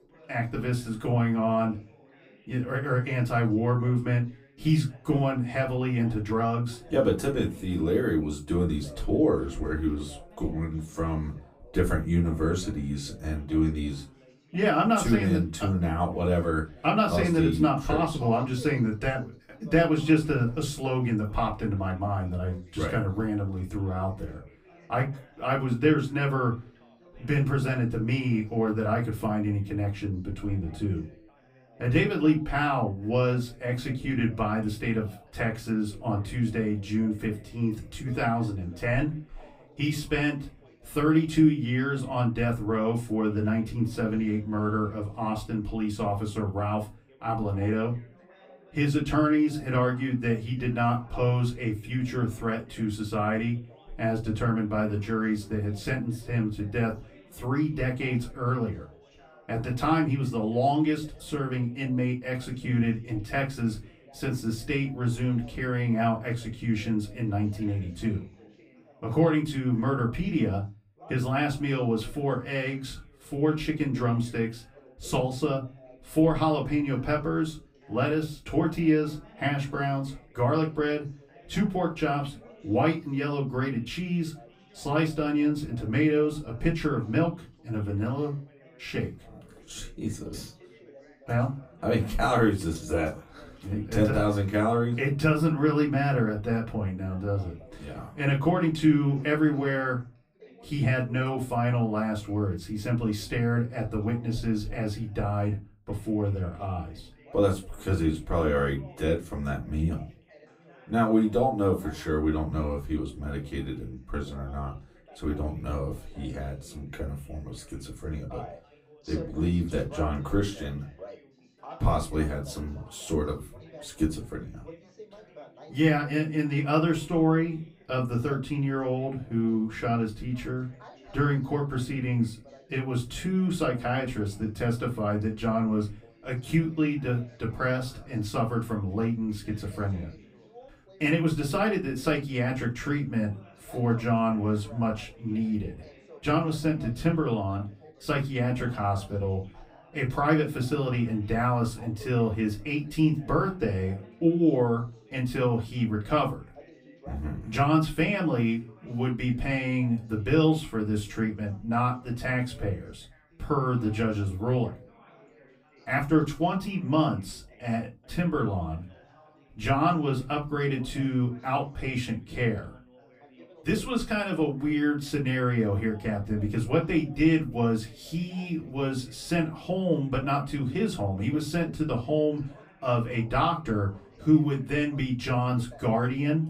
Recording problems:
off-mic speech; far
room echo; very slight; dies away in 0.2 s
background chatter; faint; throughout; 3 voices, 25 dB below the speech

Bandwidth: 15.5 kHz